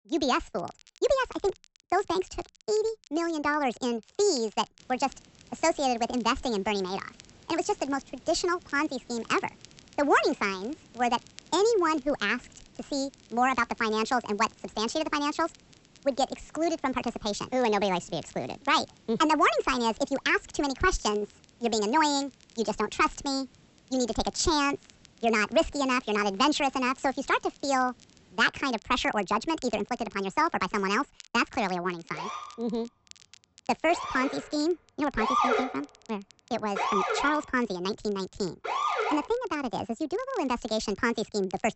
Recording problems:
wrong speed and pitch; too fast and too high; 1.5 times normal speed
high frequencies cut off; noticeable; nothing above 7.5 kHz
hiss; faint; from 5 to 28 s; 30 dB below the speech
crackle, like an old record; faint; 30 dB below the speech
siren; loud; from 32 to 39 s; peak 4 dB above the speech

